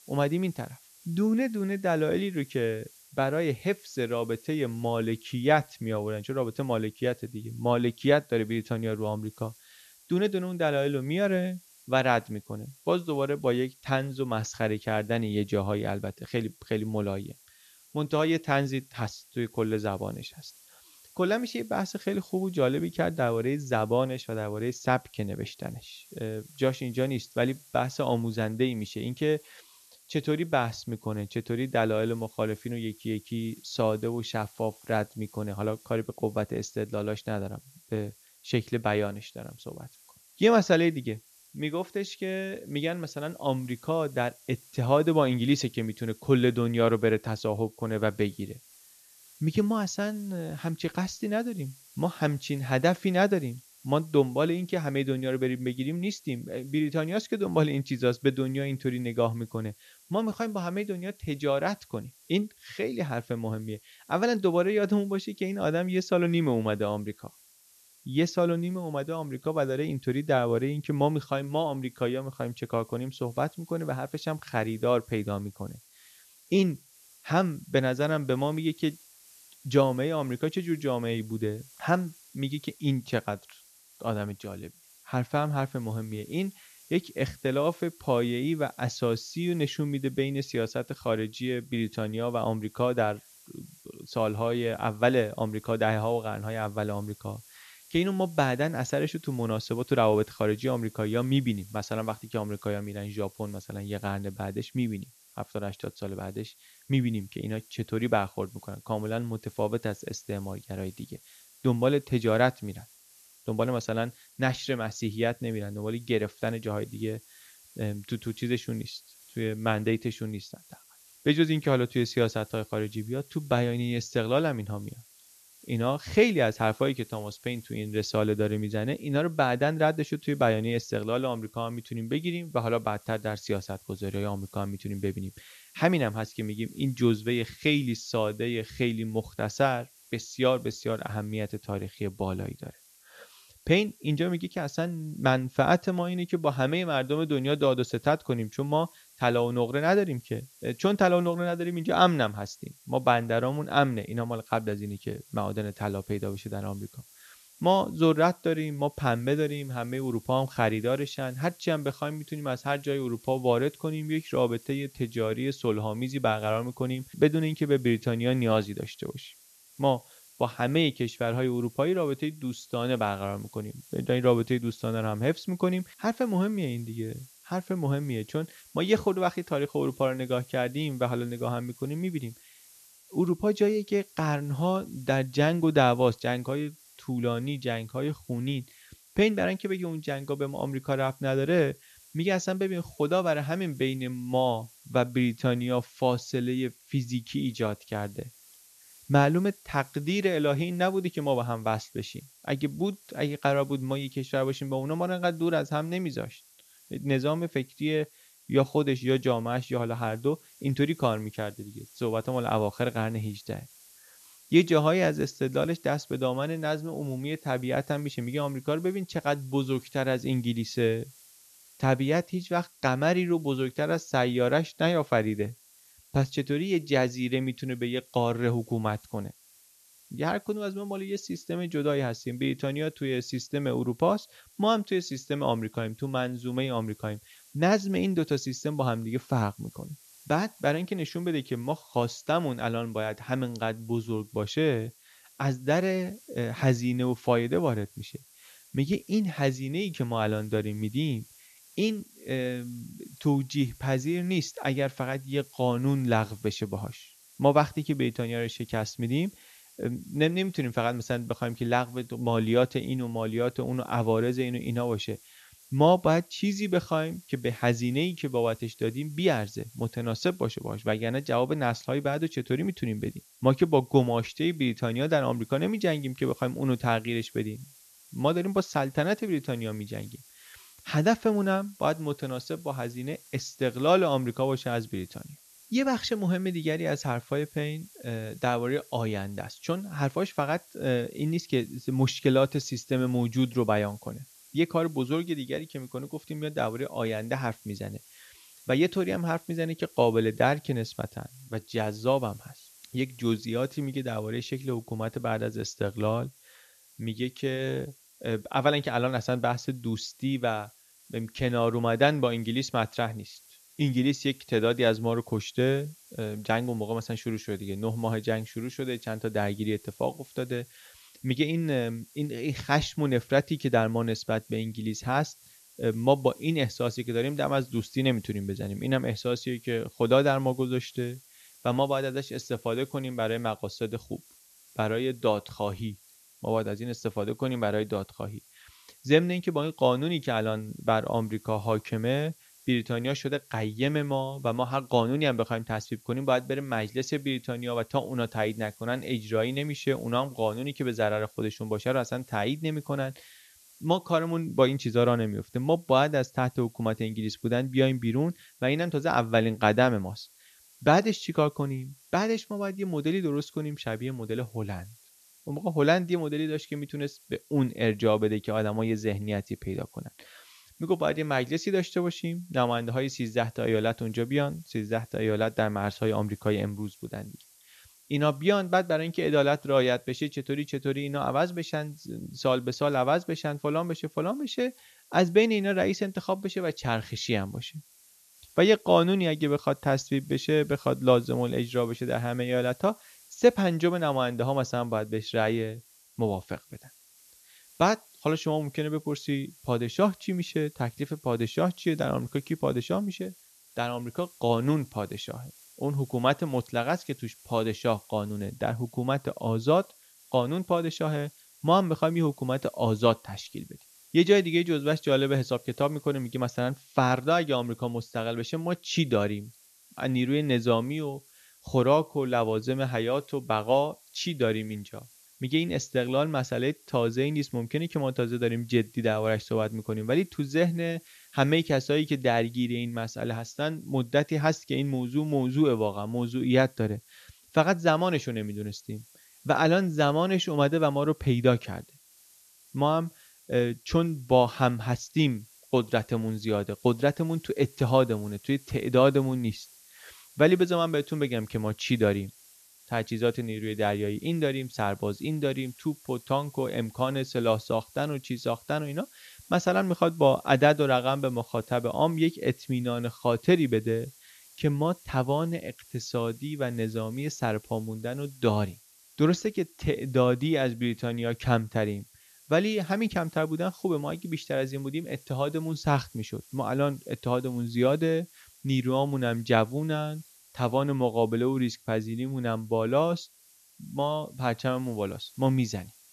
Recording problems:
high frequencies cut off; noticeable; nothing above 7 kHz
hiss; faint; throughout; 25 dB below the speech

